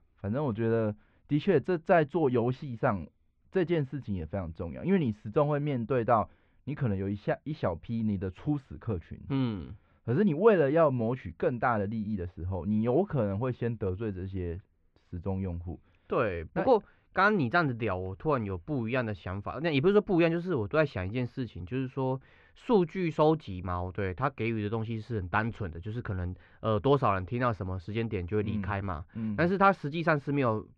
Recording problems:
muffled; very; fading above 2.5 kHz

